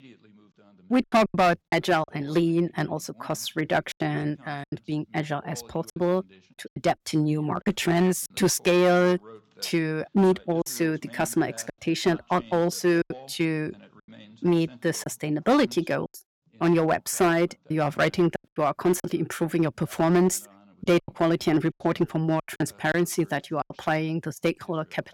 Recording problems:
distortion; slight; 3% of the sound clipped
voice in the background; faint; throughout; 25 dB below the speech
choppy; very; 7% of the speech affected

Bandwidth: 17 kHz